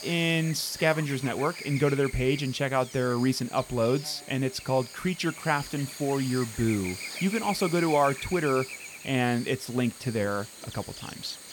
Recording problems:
electrical hum; noticeable; throughout; 60 Hz, 10 dB below the speech

